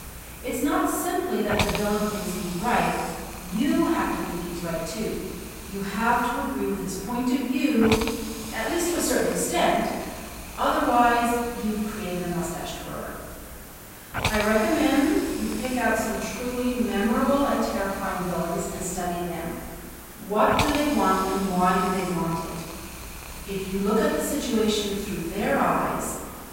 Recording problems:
room echo; strong; dies away in 1.4 s
off-mic speech; far
hiss; noticeable; throughout; 10 dB below the speech

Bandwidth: 16 kHz